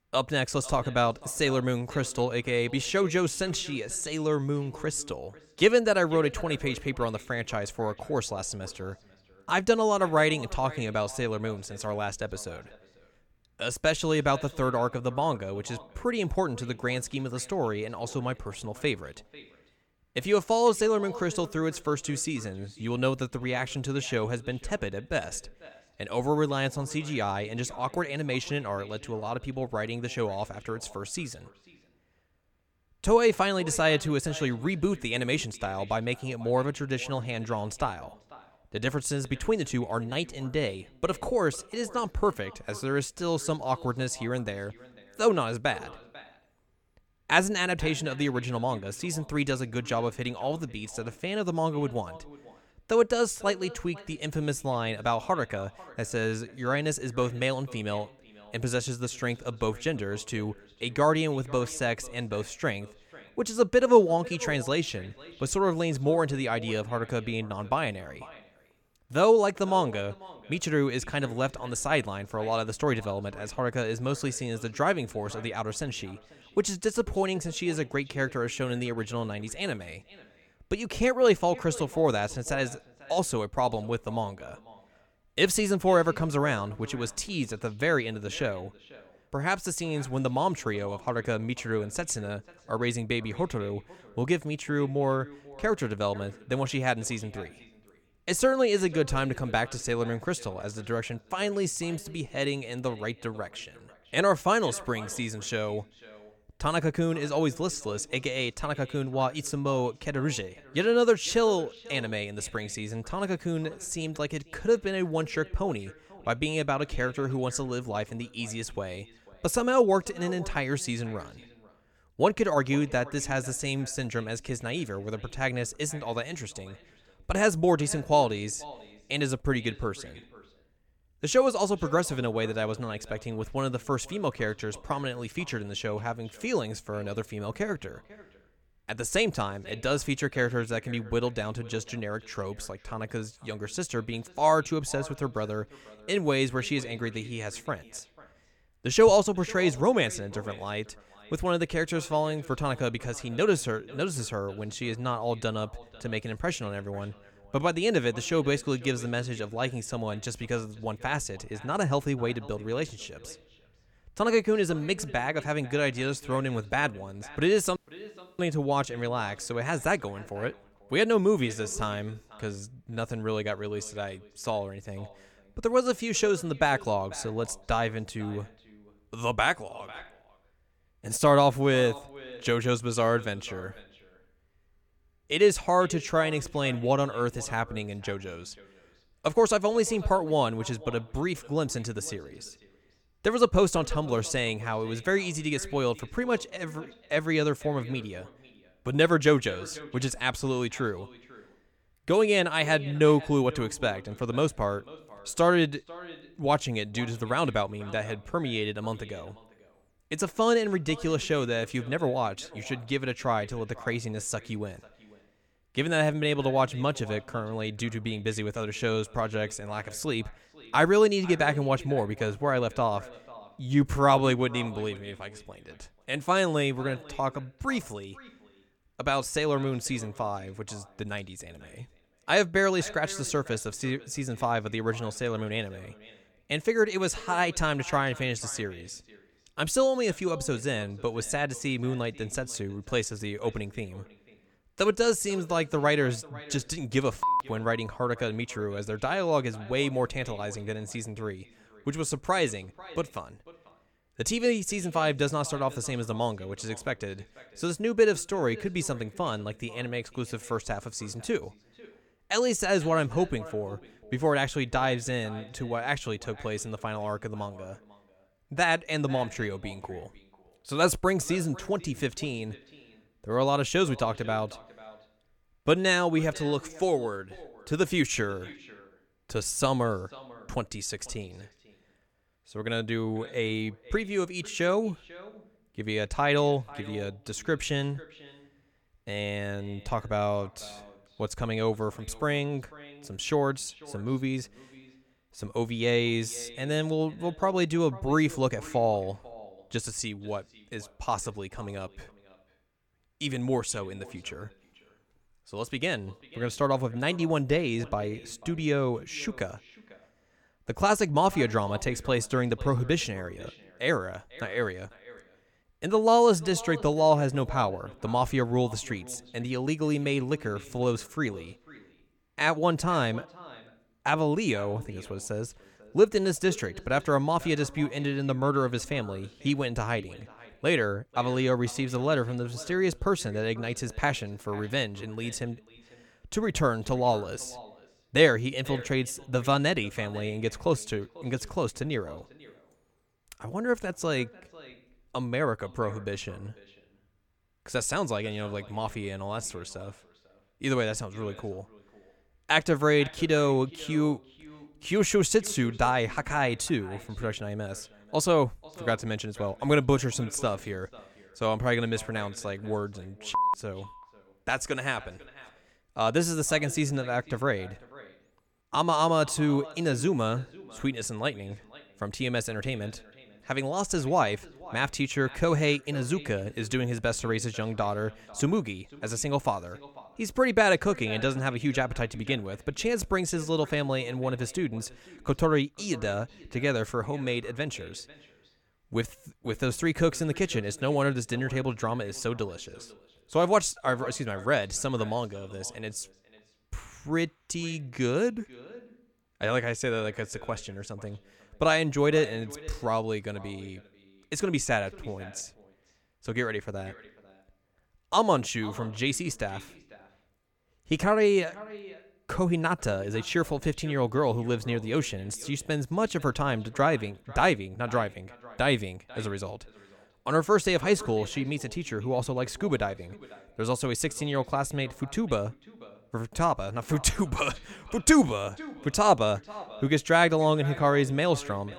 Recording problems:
echo of what is said; faint; throughout; 490 ms later, 20 dB below the speech
audio cutting out; at 2:48 for 0.5 s

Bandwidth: 18 kHz